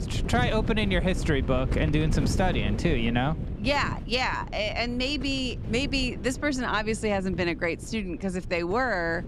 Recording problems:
wind noise on the microphone; occasional gusts; 15 dB below the speech

